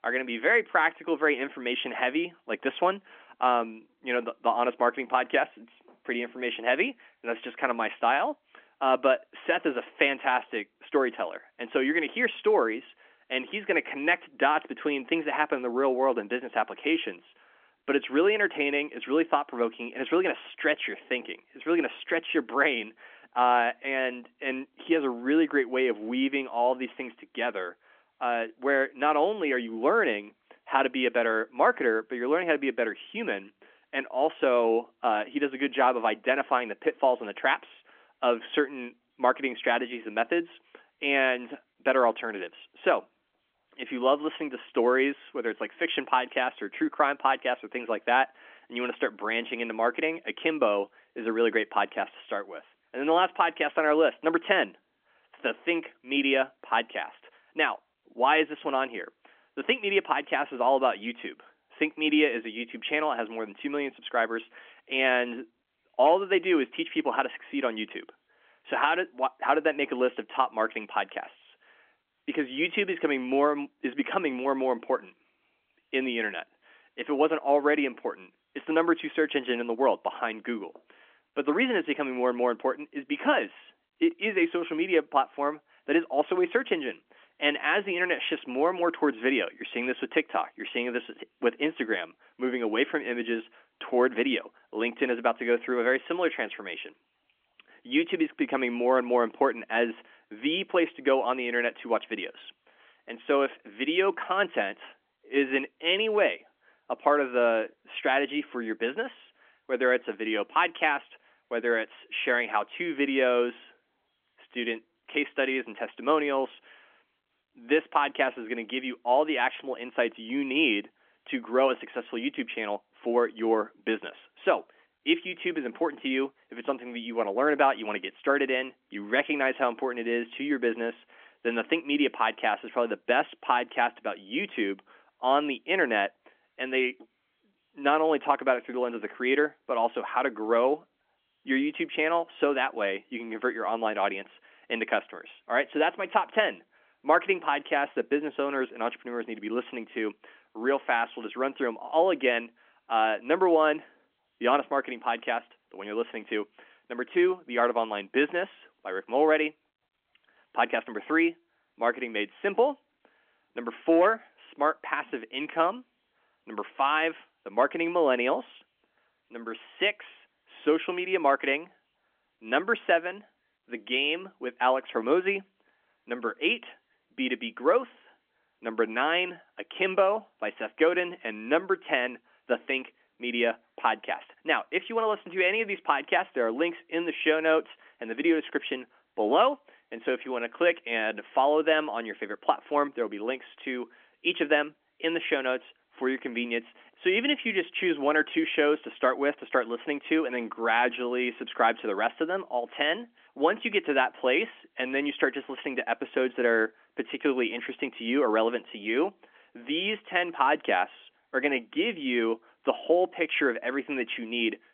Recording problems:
phone-call audio; nothing above 3.5 kHz

